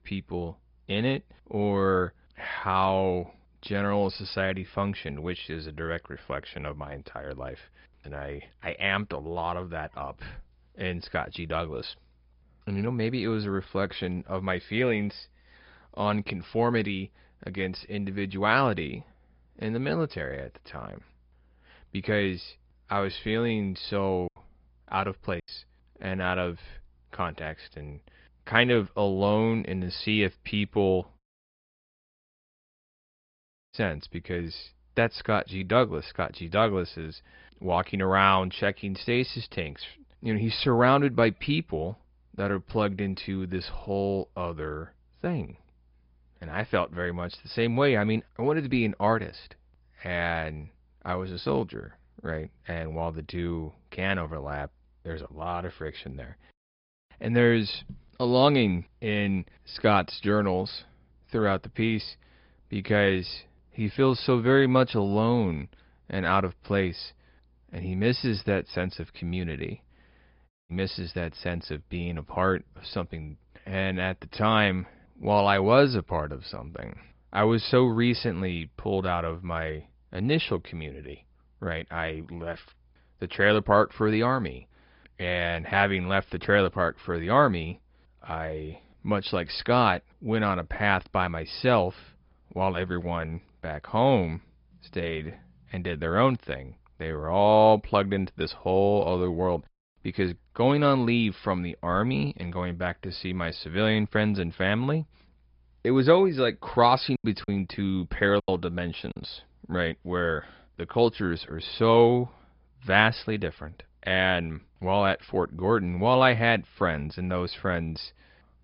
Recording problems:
high frequencies cut off; noticeable; nothing above 5 kHz
garbled, watery; slightly
choppy; very; from 24 to 25 s and from 1:47 to 1:49; 10% of the speech affected
audio cutting out; at 31 s for 2.5 s and at 1:11

